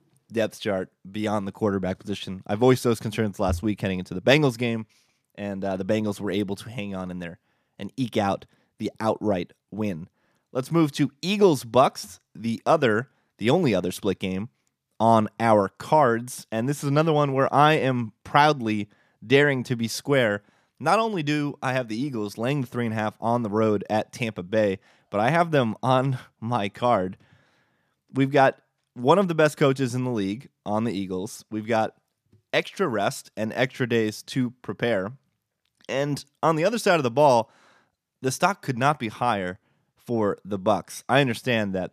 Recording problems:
none

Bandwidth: 14.5 kHz